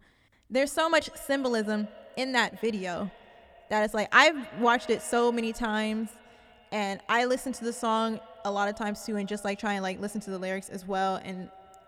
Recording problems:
echo of what is said; faint; throughout; 190 ms later, 20 dB below the speech

